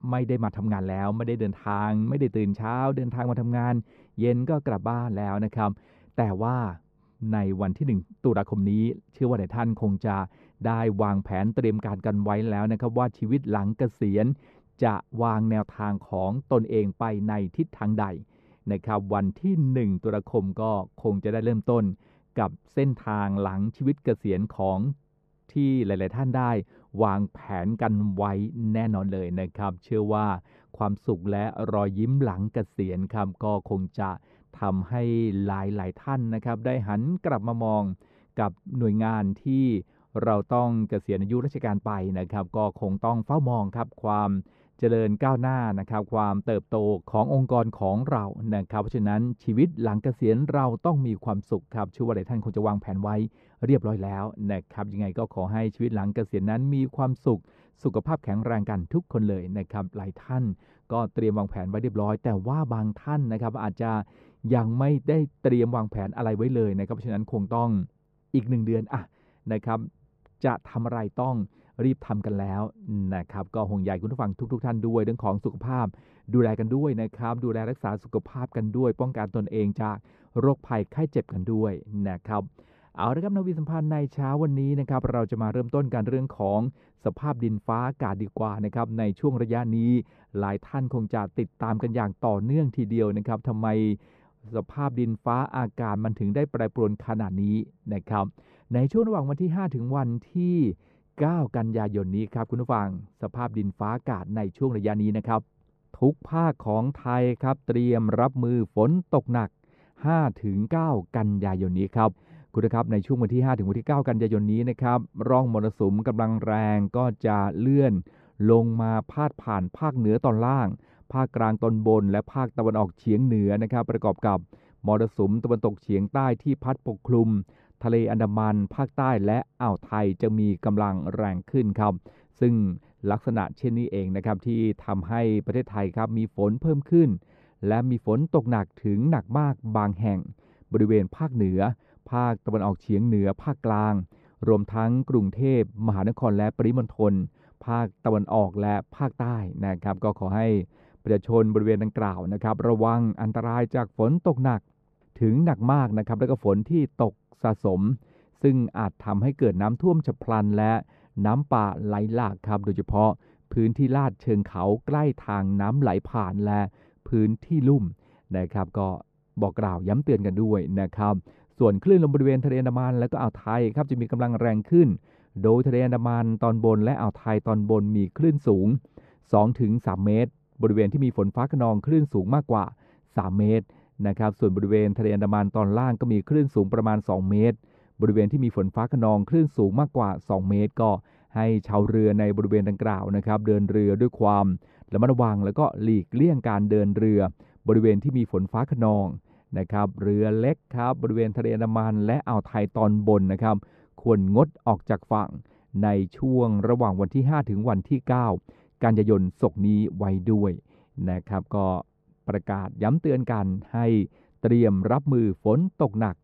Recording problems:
muffled; very; fading above 2 kHz

